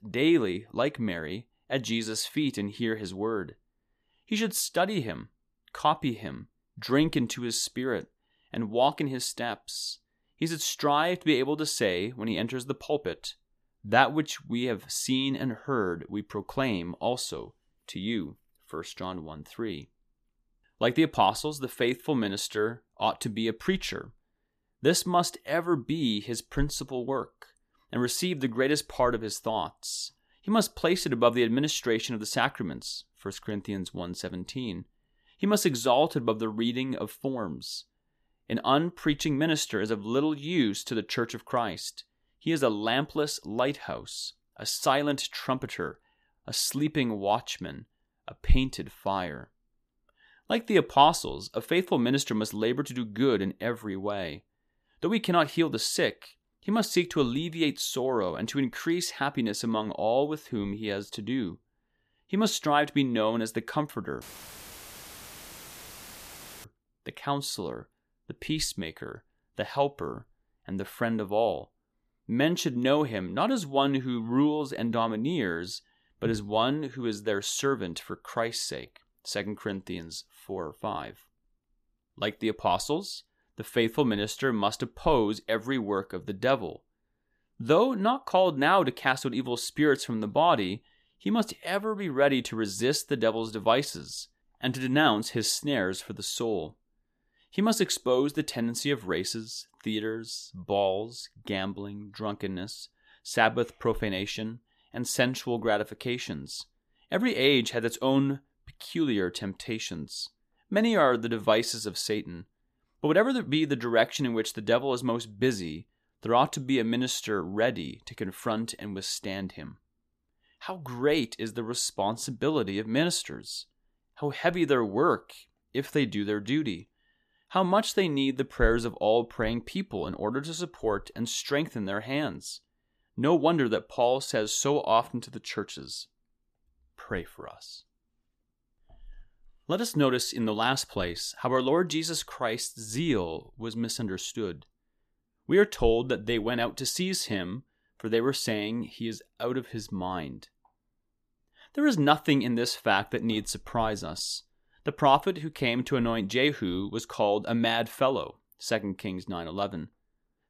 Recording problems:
audio cutting out; filled with static; at 1:04 for 2.5 s

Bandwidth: 14.5 kHz